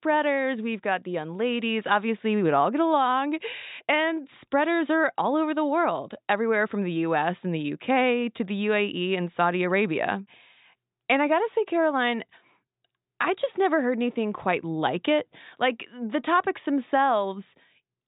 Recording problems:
high frequencies cut off; severe; nothing above 4 kHz

